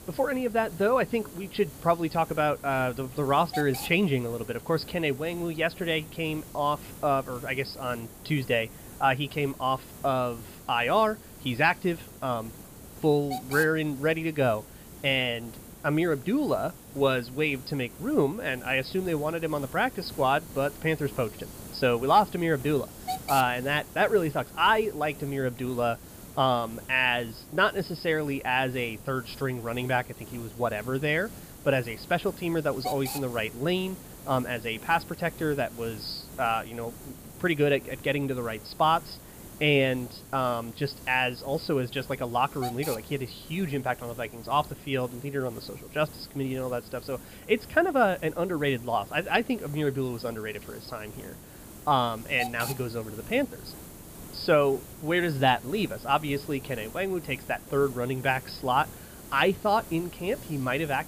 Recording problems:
high frequencies cut off; noticeable; nothing above 5.5 kHz
hiss; noticeable; throughout; 15 dB below the speech

